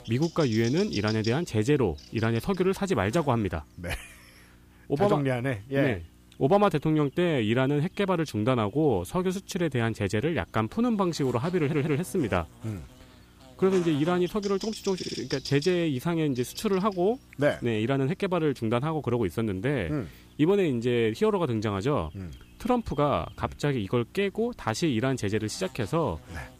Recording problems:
electrical hum; noticeable; throughout; 60 Hz, 15 dB below the speech
audio stuttering; at 12 s and at 15 s

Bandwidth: 15 kHz